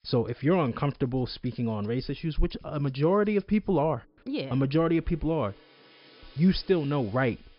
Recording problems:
high frequencies cut off; noticeable; nothing above 5.5 kHz
background music; faint; throughout; 30 dB below the speech

